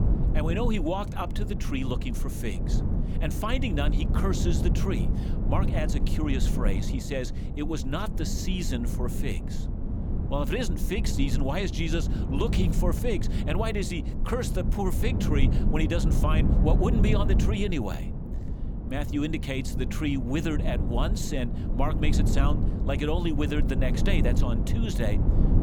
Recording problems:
low rumble; loud; throughout; 6 dB below the speech

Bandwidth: 18.5 kHz